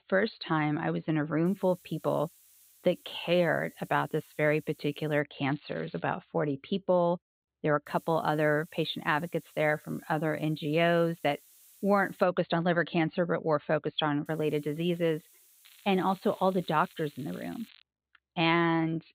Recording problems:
high frequencies cut off; severe; nothing above 4.5 kHz
hiss; faint; from 1.5 to 5 s, from 8 to 12 s and from 14 to 18 s; 25 dB below the speech
crackling; faint; at 5.5 s and from 16 to 18 s; 25 dB below the speech

